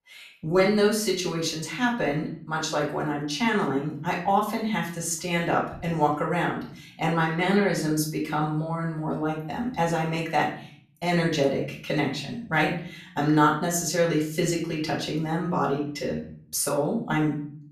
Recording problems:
off-mic speech; far
room echo; slight; dies away in 0.5 s

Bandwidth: 14.5 kHz